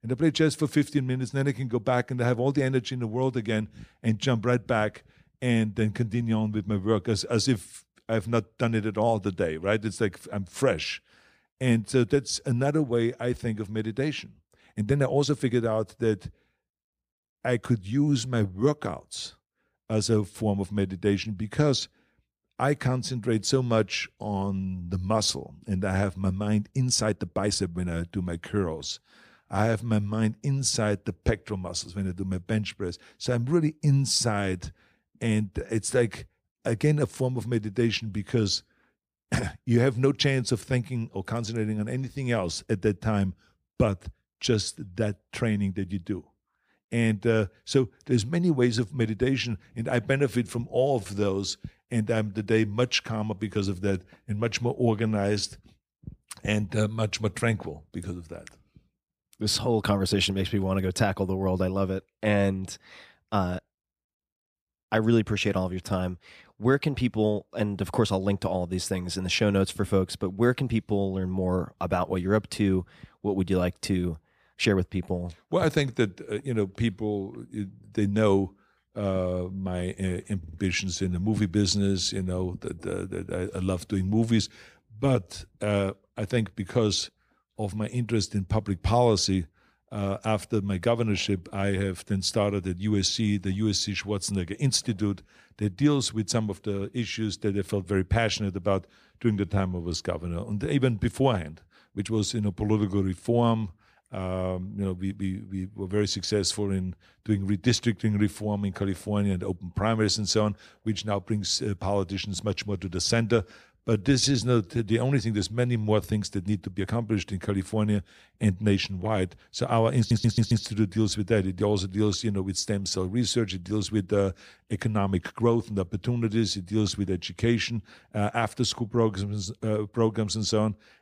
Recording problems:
uneven, jittery; strongly; from 14 s to 1:57
audio stuttering; at 1:20 and at 2:00

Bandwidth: 15 kHz